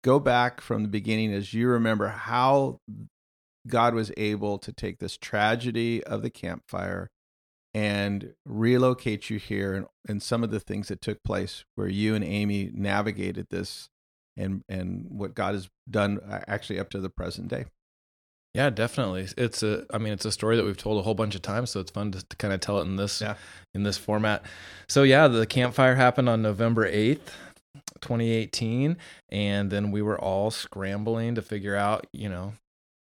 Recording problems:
none

